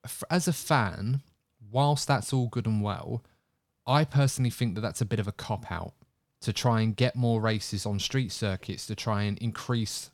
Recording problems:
none

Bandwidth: 18.5 kHz